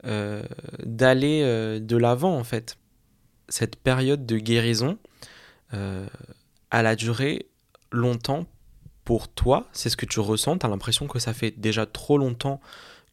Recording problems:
none

